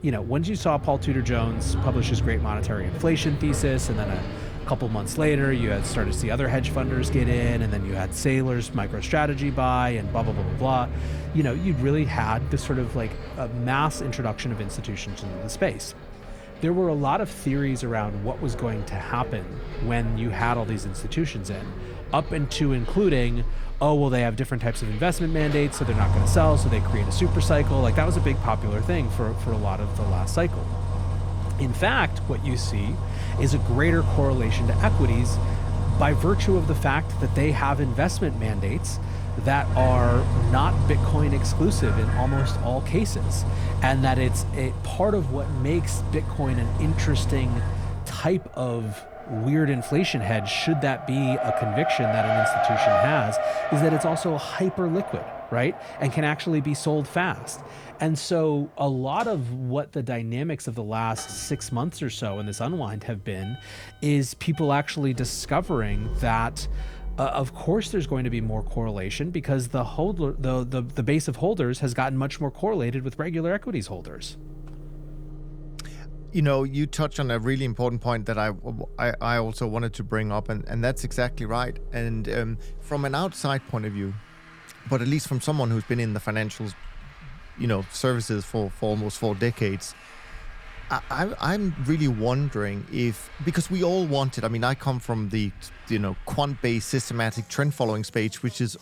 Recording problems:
traffic noise; loud; throughout; 2 dB below the speech

